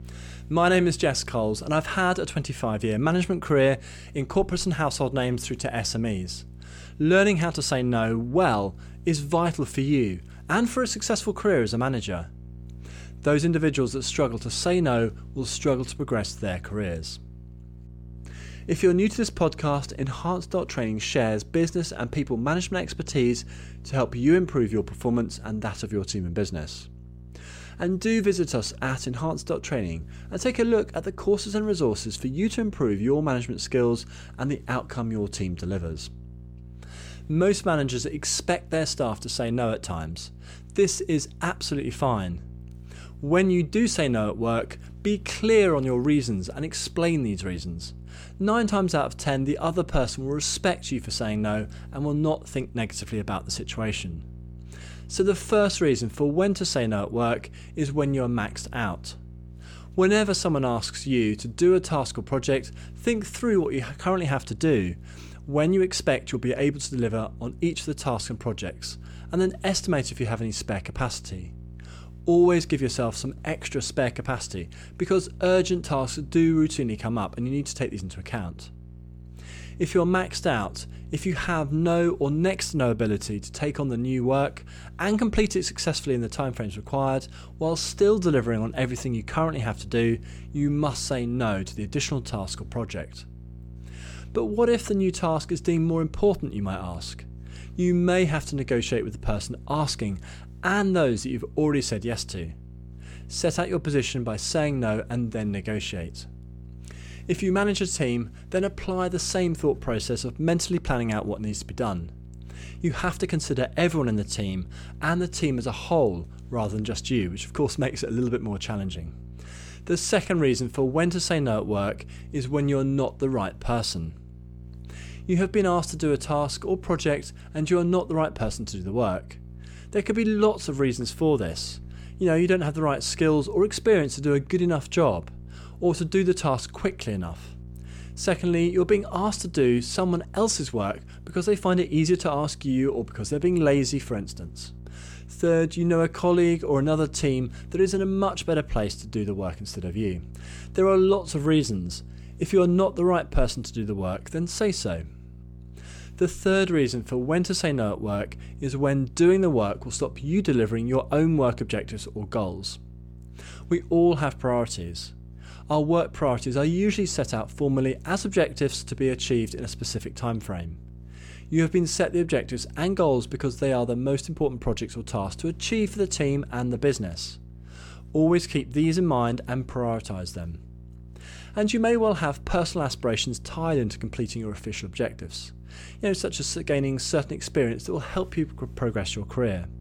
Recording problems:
electrical hum; faint; throughout; 60 Hz, 30 dB below the speech

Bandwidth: 18.5 kHz